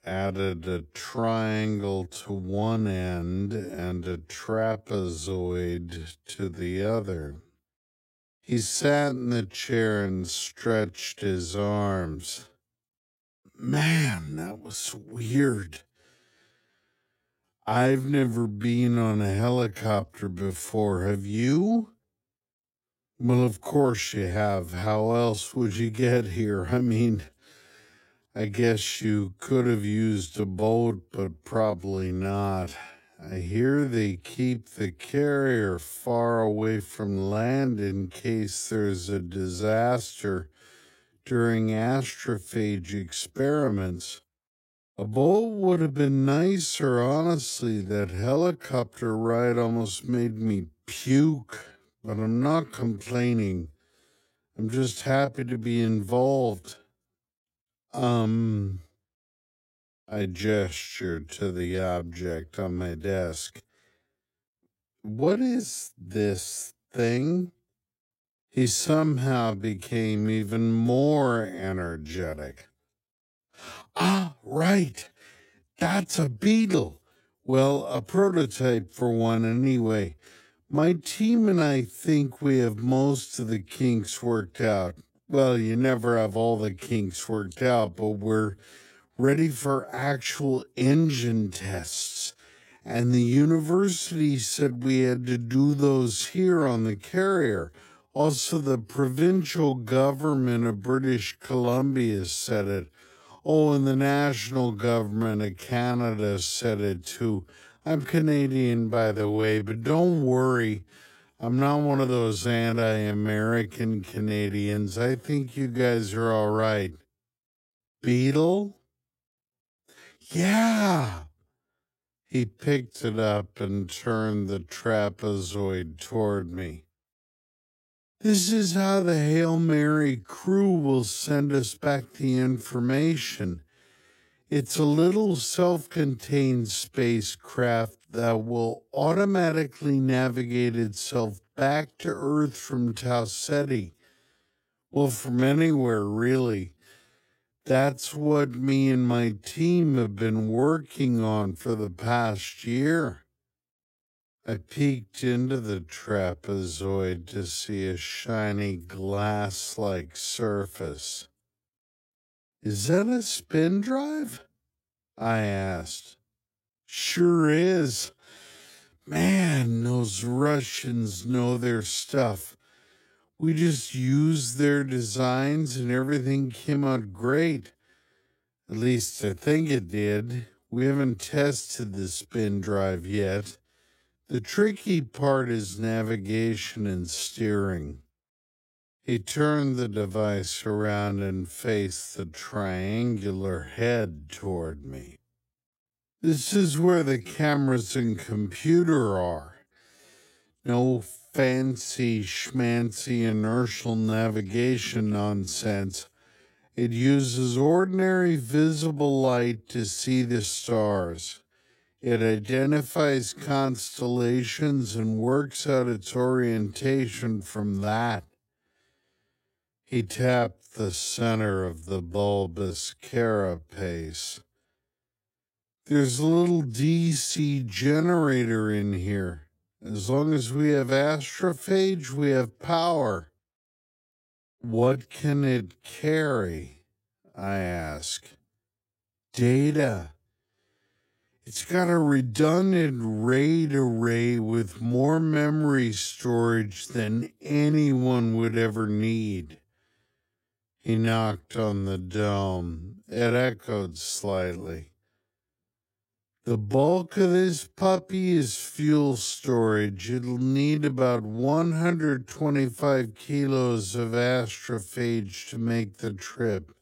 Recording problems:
wrong speed, natural pitch; too slow; 0.5 times normal speed

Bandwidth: 16 kHz